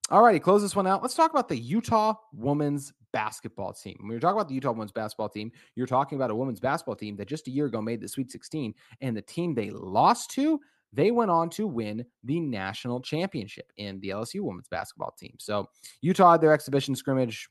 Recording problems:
none

